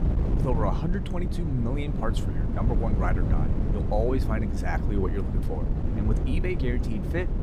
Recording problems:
wind noise on the microphone; heavy; 4 dB below the speech

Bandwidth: 15.5 kHz